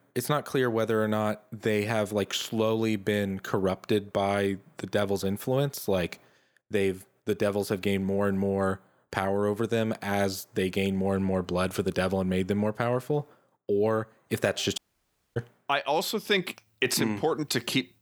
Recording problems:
audio cutting out; at 15 s for 0.5 s

